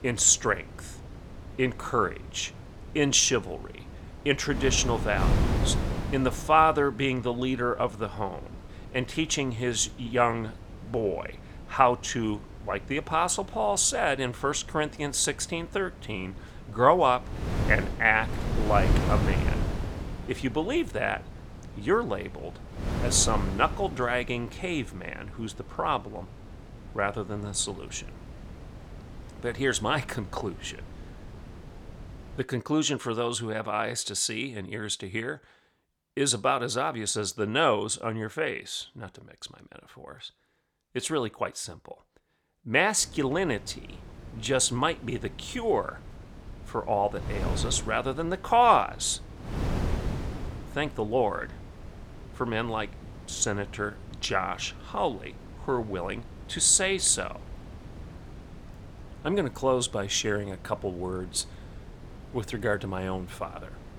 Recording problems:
wind noise on the microphone; occasional gusts; until 32 s and from 43 s on; 15 dB below the speech

